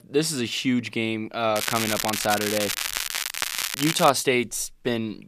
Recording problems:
crackling; loud; from 1.5 to 4 s; 2 dB below the speech

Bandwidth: 14.5 kHz